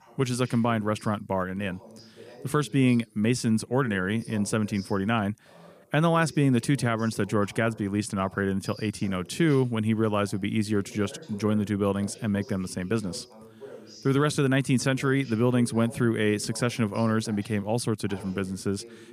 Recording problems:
voice in the background; faint; throughout; 20 dB below the speech

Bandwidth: 15 kHz